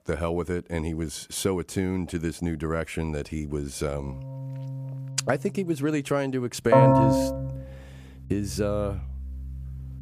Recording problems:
background music; very loud; from 4.5 s on; 3 dB above the speech

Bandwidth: 14.5 kHz